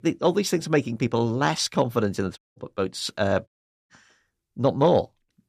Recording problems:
audio cutting out; at 2.5 s and at 3.5 s

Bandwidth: 14.5 kHz